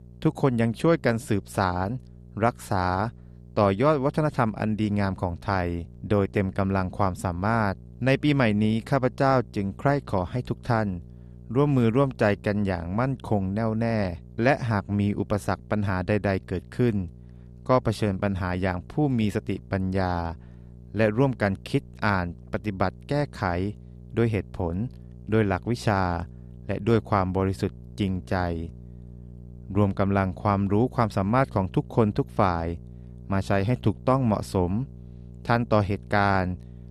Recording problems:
electrical hum; faint; throughout; 60 Hz, 30 dB below the speech

